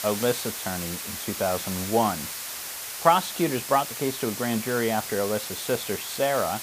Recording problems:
hiss; loud; throughout; 5 dB below the speech

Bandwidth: 15 kHz